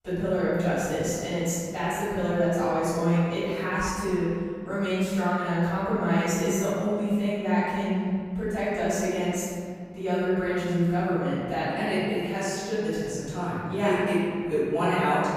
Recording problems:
room echo; strong; dies away in 2 s
off-mic speech; far

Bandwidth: 15.5 kHz